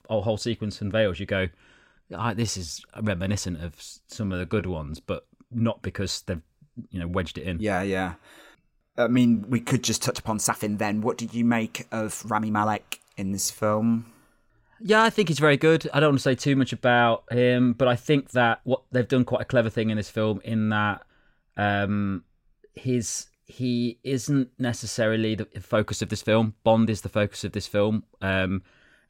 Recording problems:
uneven, jittery; strongly; from 2 to 25 s

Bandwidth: 16 kHz